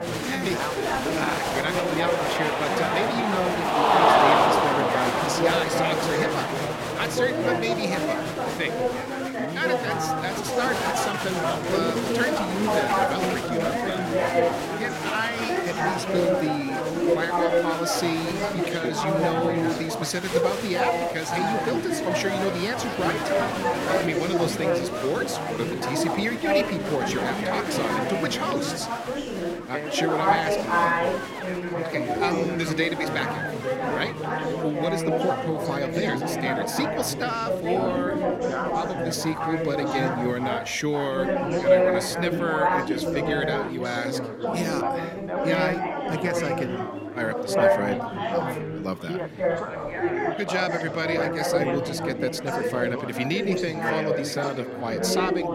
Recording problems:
chatter from many people; very loud; throughout; 4 dB above the speech

